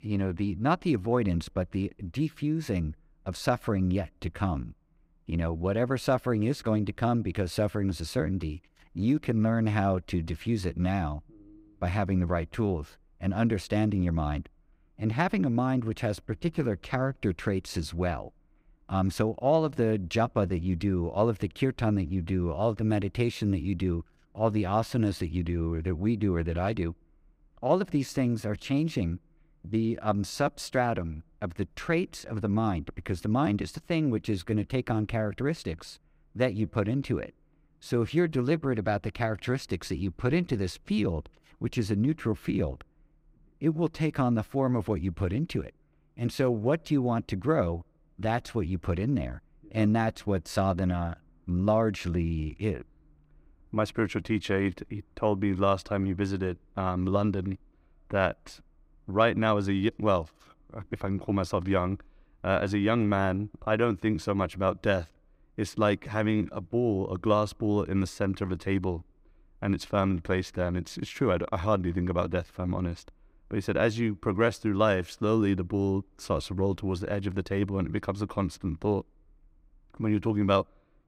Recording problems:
none

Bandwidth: 15.5 kHz